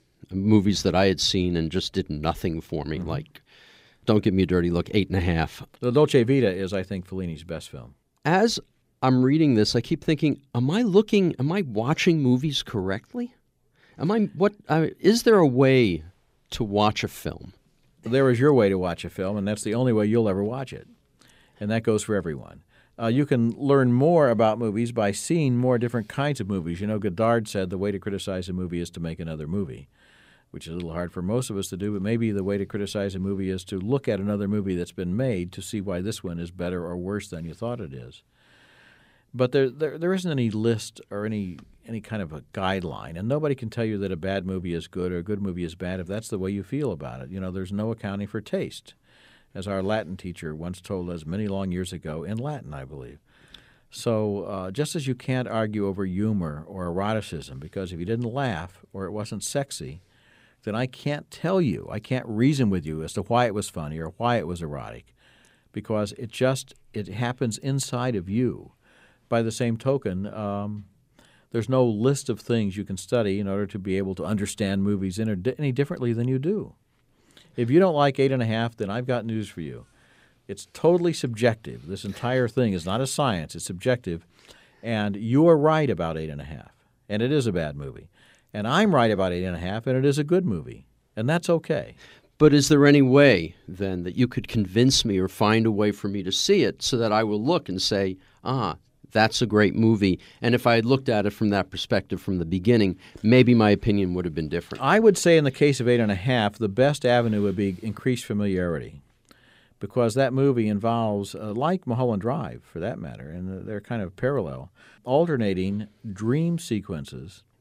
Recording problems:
none

